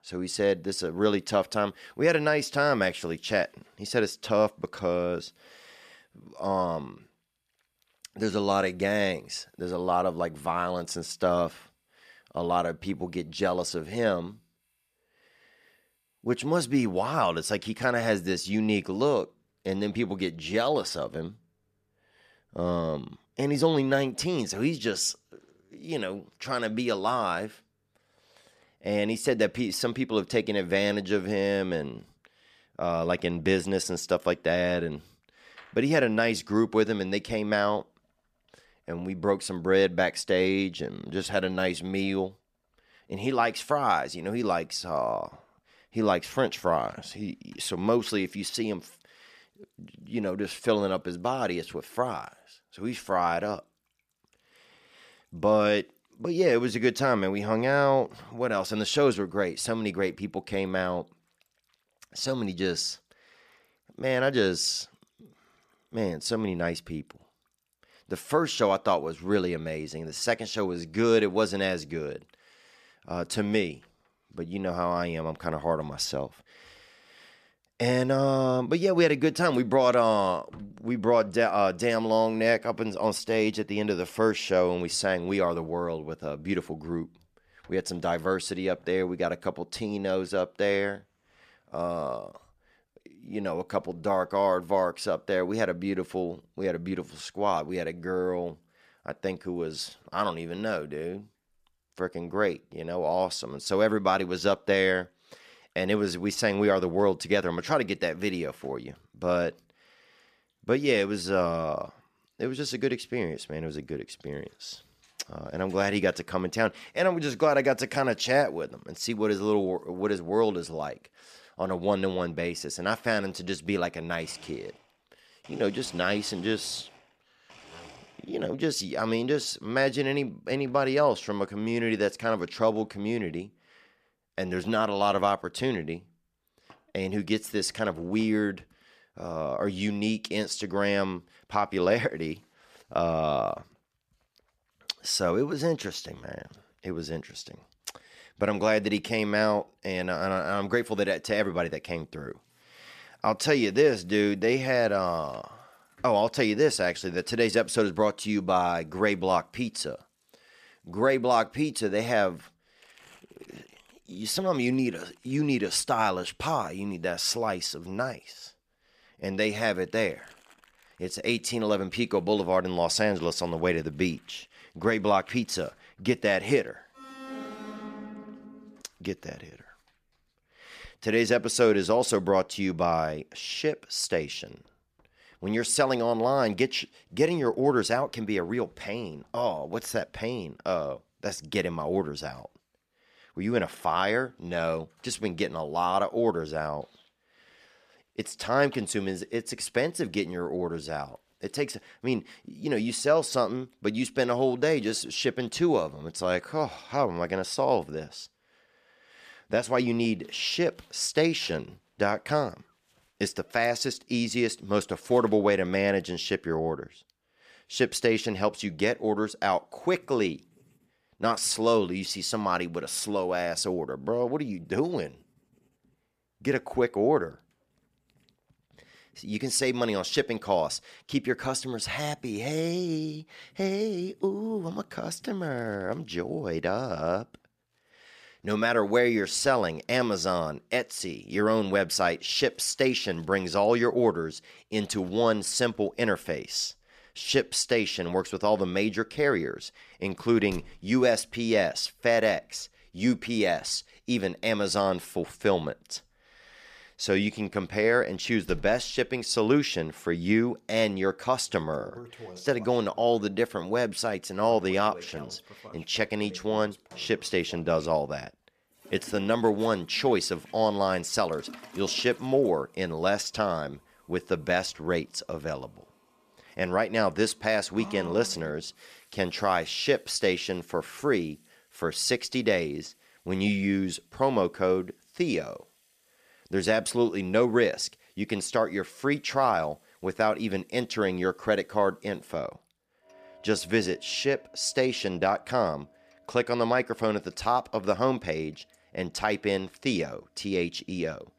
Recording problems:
household noises; faint; throughout; 30 dB below the speech
alarm; faint; from 2:57 to 2:59; peak 10 dB below the speech

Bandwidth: 14.5 kHz